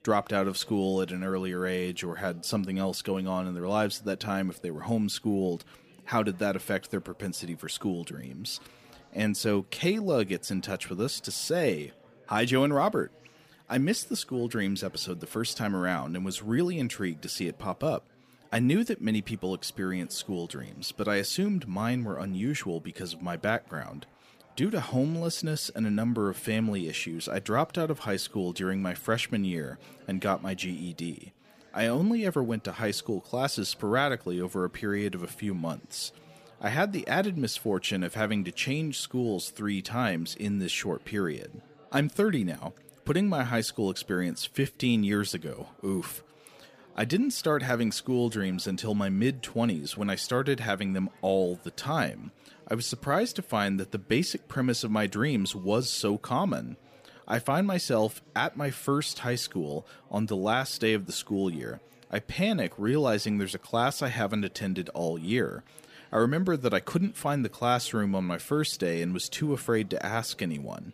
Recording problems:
chatter from many people; faint; throughout; 25 dB below the speech

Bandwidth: 15 kHz